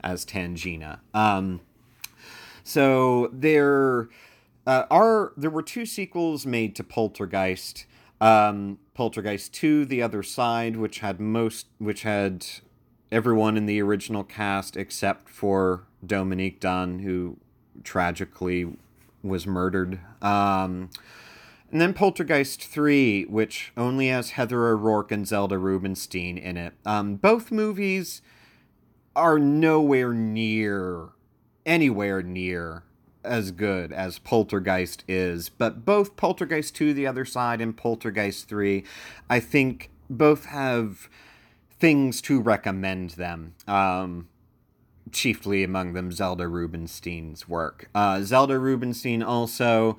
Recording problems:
none

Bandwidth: 18.5 kHz